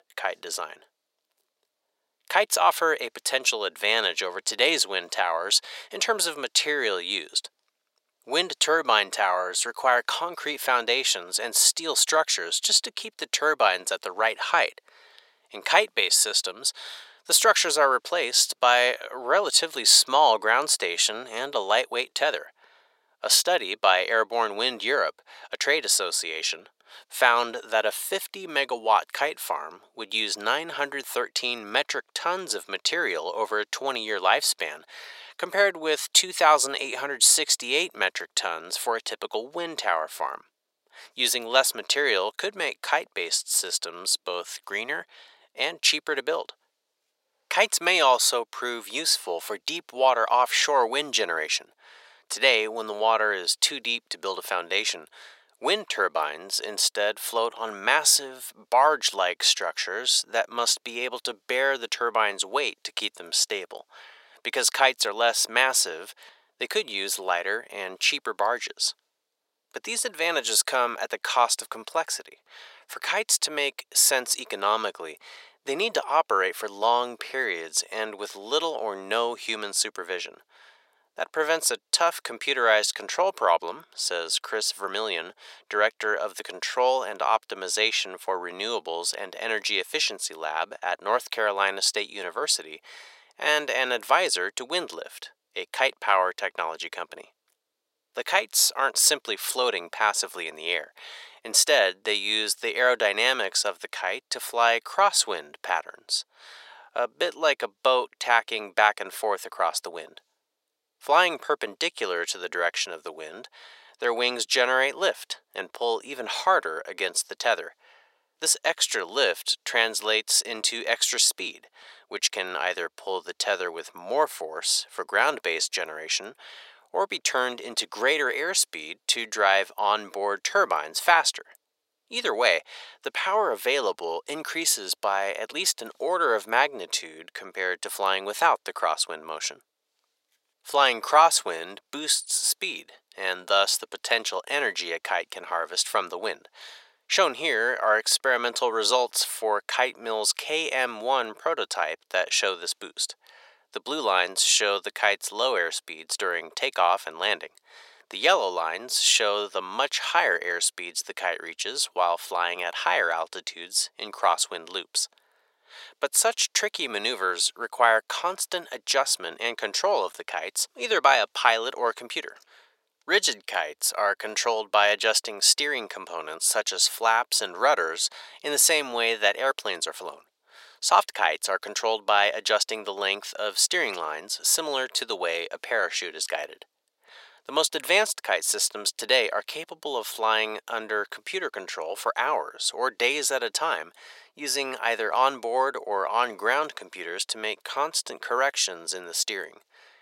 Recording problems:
thin; very; fading below 600 Hz

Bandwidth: 16 kHz